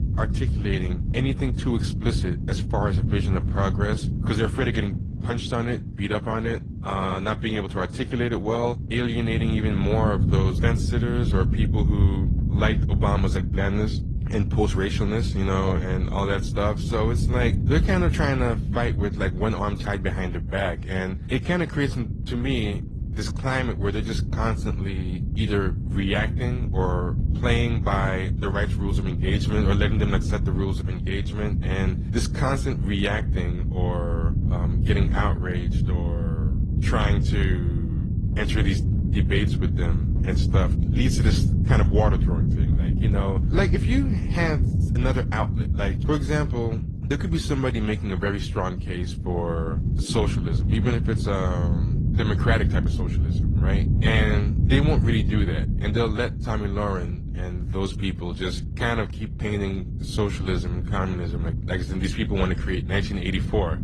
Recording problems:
garbled, watery; slightly; nothing above 10 kHz
low rumble; loud; throughout; 9 dB below the speech

